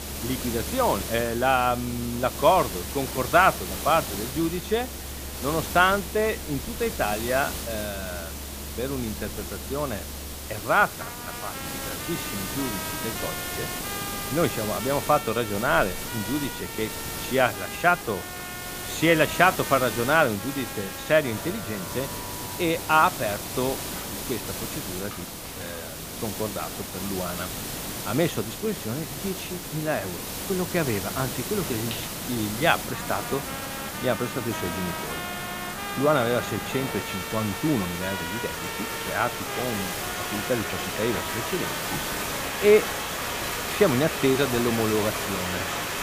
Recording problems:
rain or running water; loud; throughout; 9 dB below the speech
hiss; loud; throughout; 7 dB below the speech
background music; noticeable; throughout; 10 dB below the speech

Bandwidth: 15 kHz